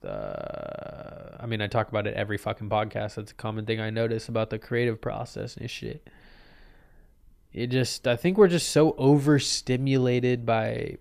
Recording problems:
none

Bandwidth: 14.5 kHz